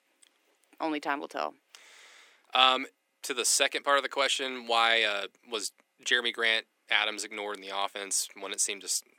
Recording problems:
thin; somewhat; fading below 300 Hz

